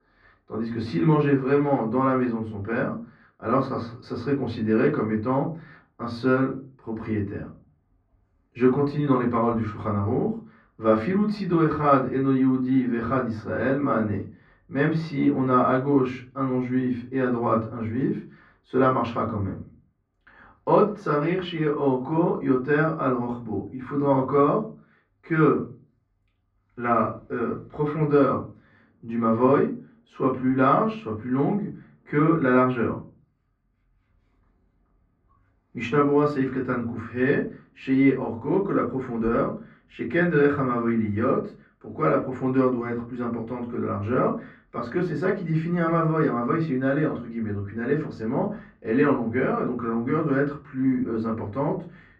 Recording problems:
off-mic speech; far
muffled; very; fading above 2 kHz
room echo; very slight; dies away in 0.3 s

